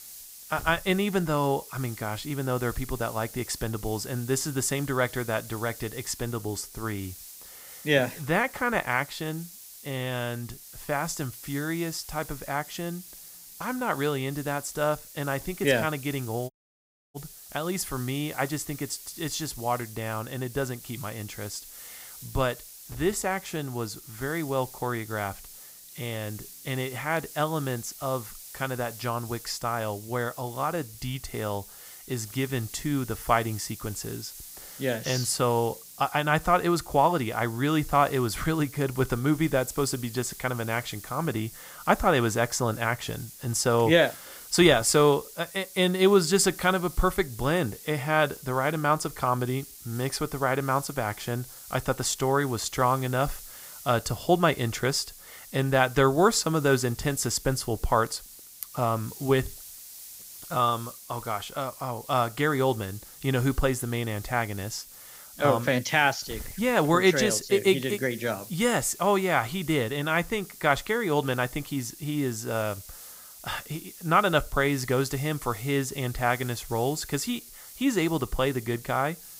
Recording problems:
hiss; noticeable; throughout; 15 dB below the speech
audio cutting out; at 17 s for 0.5 s

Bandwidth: 15.5 kHz